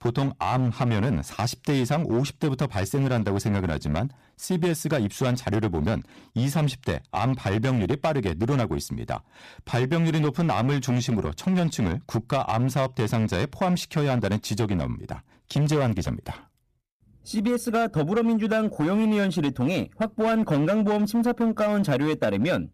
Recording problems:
distortion; slight; 12% of the sound clipped

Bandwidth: 14.5 kHz